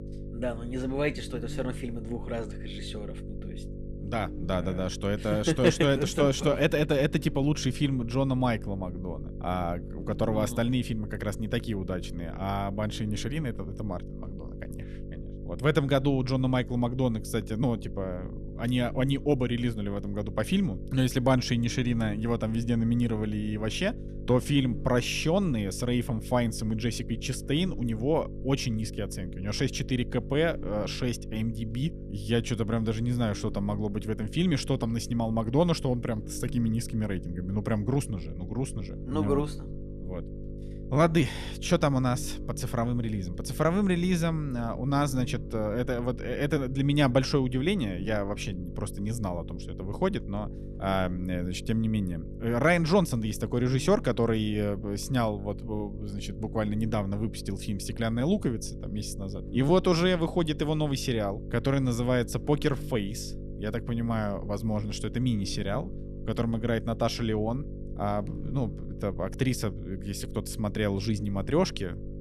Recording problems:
electrical hum; noticeable; throughout; 50 Hz, 15 dB below the speech

